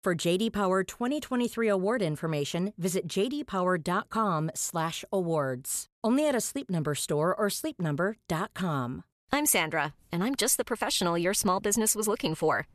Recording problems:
none

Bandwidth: 13.5 kHz